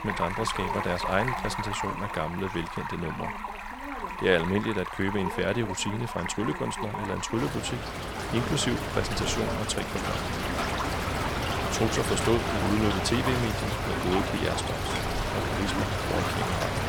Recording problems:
rain or running water; loud; throughout; 1 dB below the speech
voice in the background; noticeable; throughout; 15 dB below the speech

